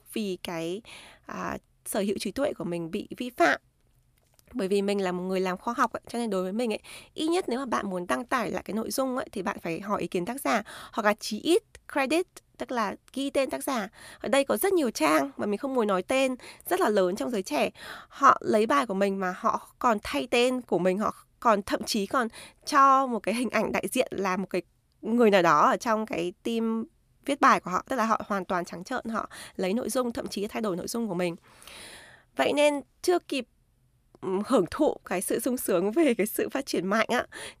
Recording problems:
none

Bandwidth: 14.5 kHz